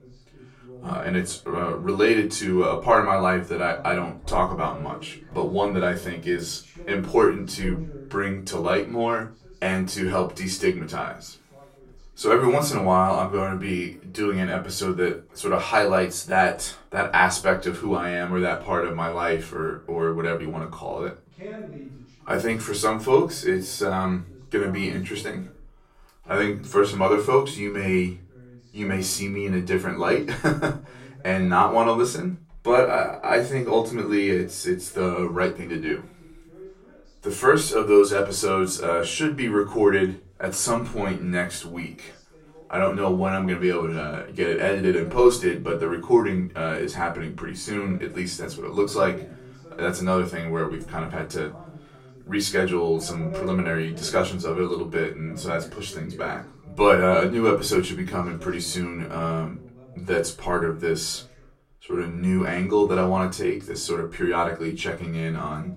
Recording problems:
off-mic speech; far
room echo; very slight; dies away in 0.3 s
voice in the background; faint; throughout; 20 dB below the speech

